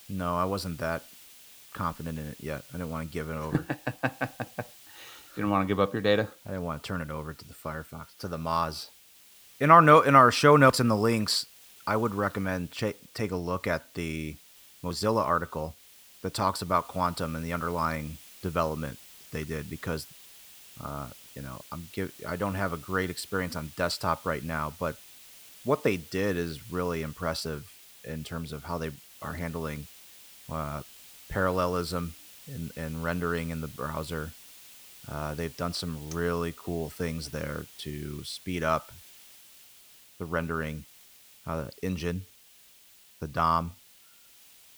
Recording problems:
hiss; faint; throughout; 20 dB below the speech

